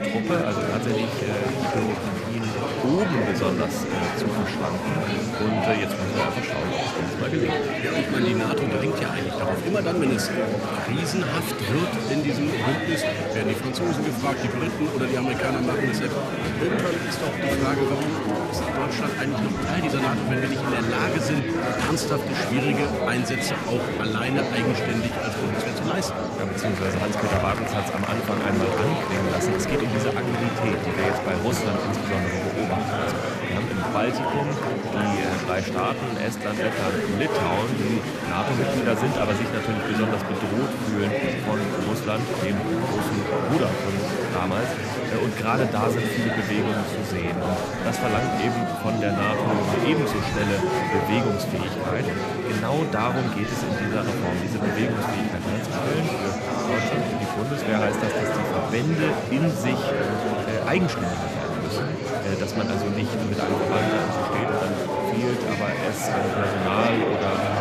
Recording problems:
murmuring crowd; very loud; throughout; 2 dB above the speech

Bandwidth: 14.5 kHz